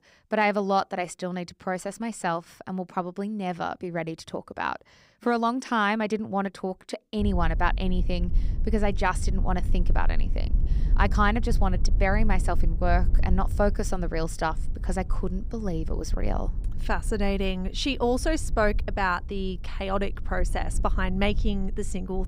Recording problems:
low rumble; faint; from 7 s on; 20 dB below the speech

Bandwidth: 15.5 kHz